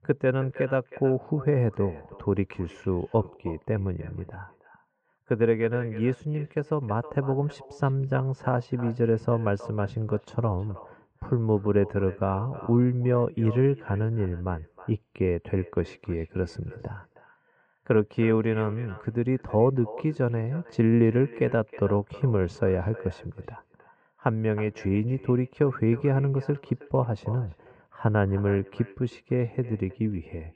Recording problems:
muffled; very; fading above 1.5 kHz
echo of what is said; faint; throughout; 320 ms later, 20 dB below the speech

